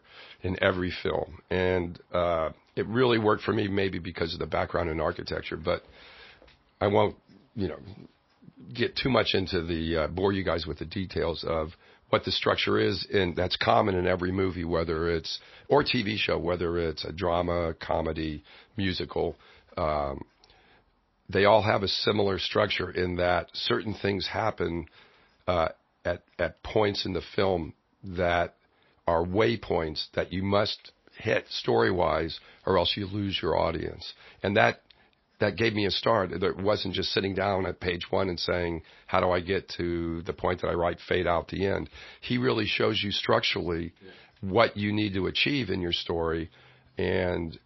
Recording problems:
garbled, watery; slightly; nothing above 5.5 kHz

